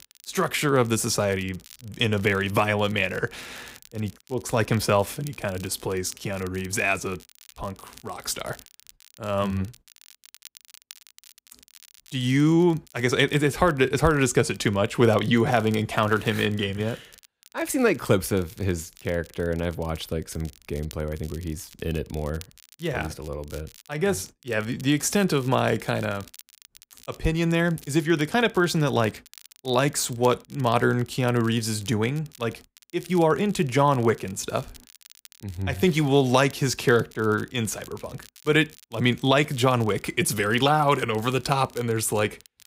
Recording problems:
crackle, like an old record; faint; 25 dB below the speech

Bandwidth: 15.5 kHz